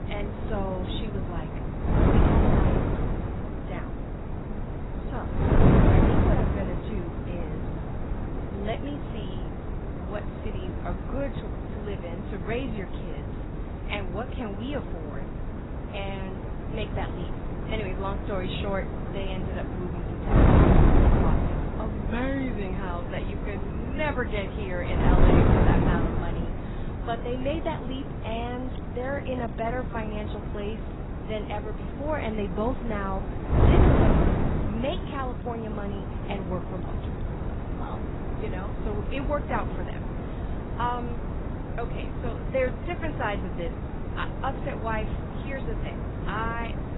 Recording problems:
garbled, watery; badly; nothing above 4 kHz
wind noise on the microphone; heavy; as loud as the speech
rain or running water; faint; throughout; 25 dB below the speech

